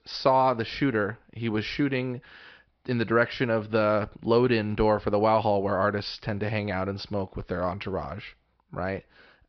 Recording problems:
high frequencies cut off; noticeable; nothing above 5.5 kHz

